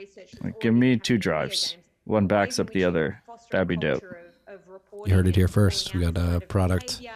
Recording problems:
voice in the background; faint; throughout; 20 dB below the speech

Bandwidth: 14.5 kHz